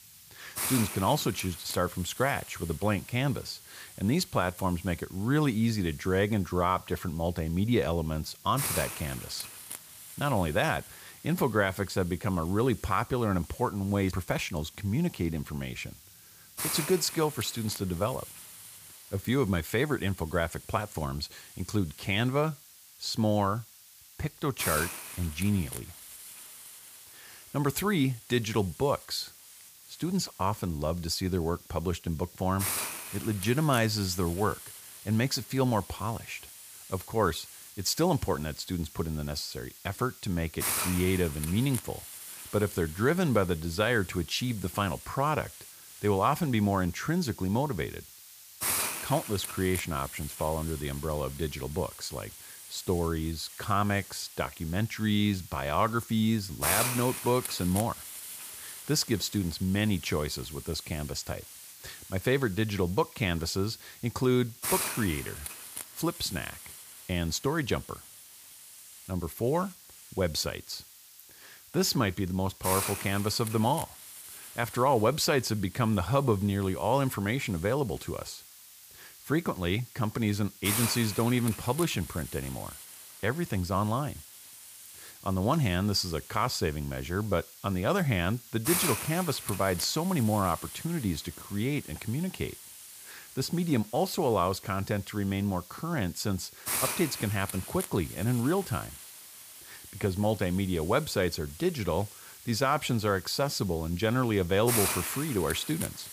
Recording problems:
hiss; loud; throughout; 9 dB below the speech

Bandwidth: 15 kHz